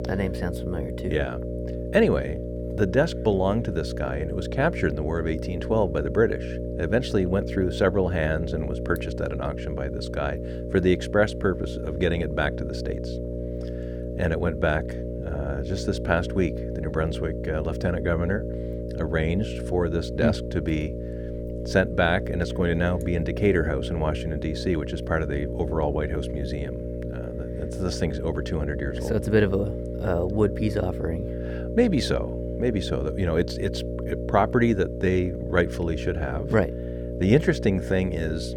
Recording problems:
electrical hum; loud; throughout; 60 Hz, 8 dB below the speech

